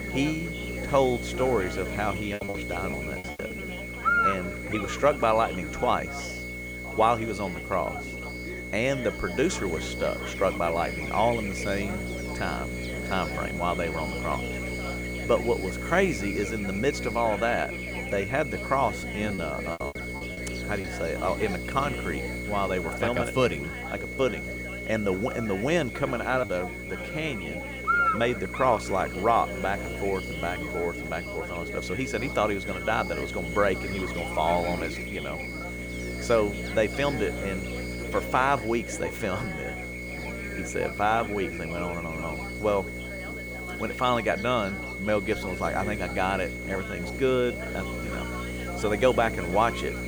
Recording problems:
electrical hum; loud; throughout; 60 Hz, 9 dB below the speech
high-pitched whine; loud; throughout; 2 kHz, 9 dB below the speech
background chatter; noticeable; throughout; 3 voices, 15 dB below the speech
hiss; faint; throughout; 25 dB below the speech
choppy; very; from 2.5 to 3.5 s and from 19 to 21 s; 12% of the speech affected

